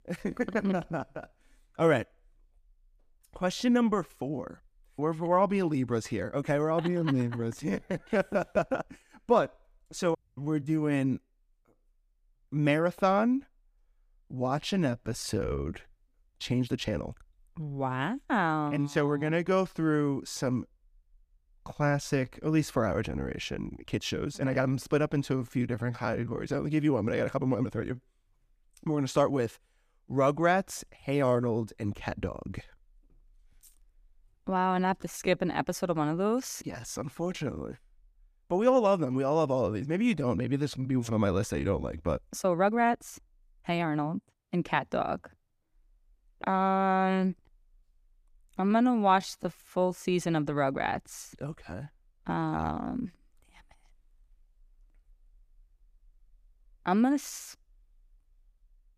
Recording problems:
uneven, jittery; strongly; from 4 to 53 s

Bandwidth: 14.5 kHz